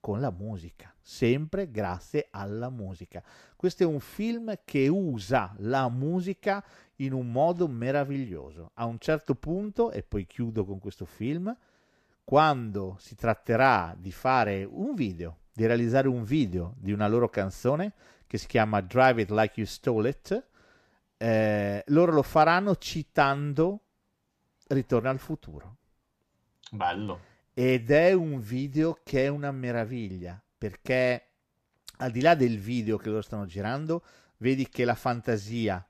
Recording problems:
none

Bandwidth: 14.5 kHz